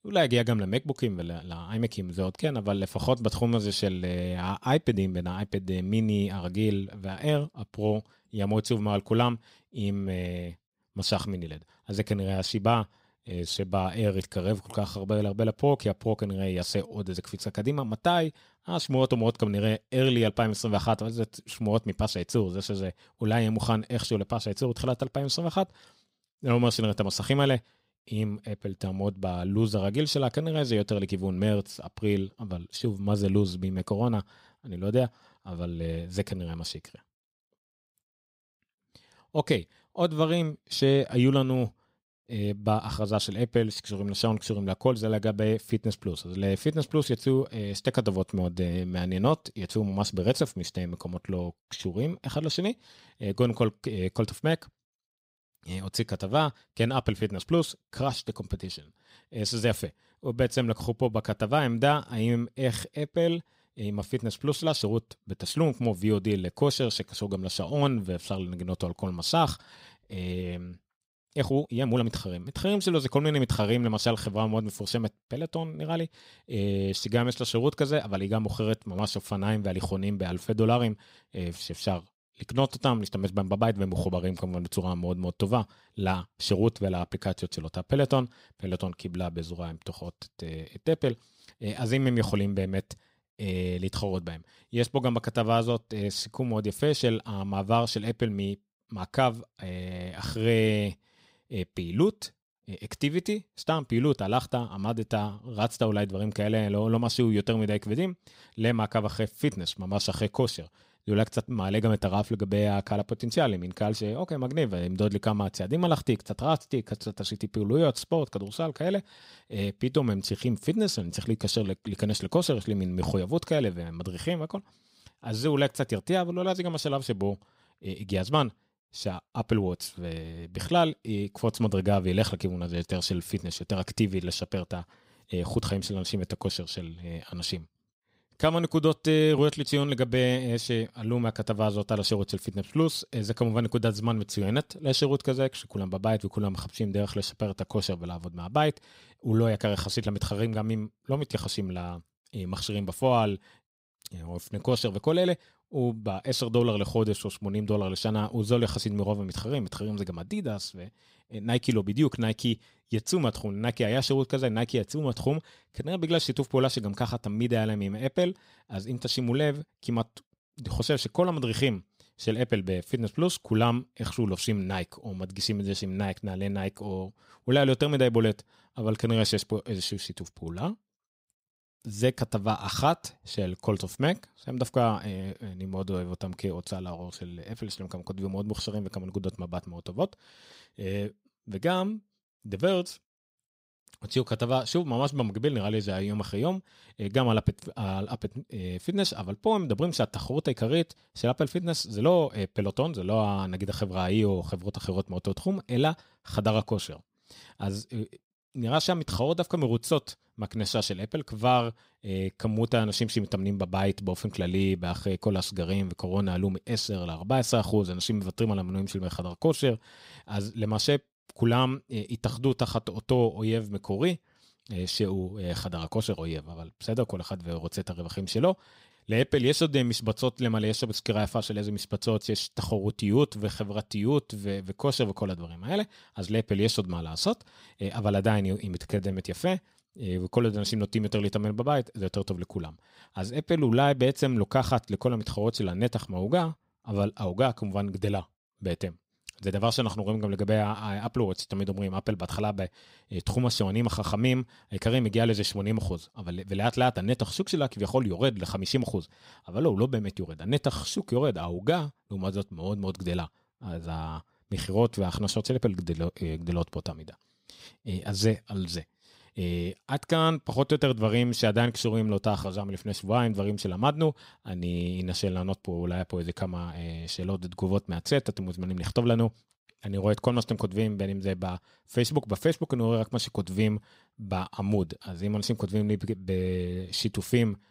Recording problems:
uneven, jittery; strongly; from 13 s to 3:59

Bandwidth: 15.5 kHz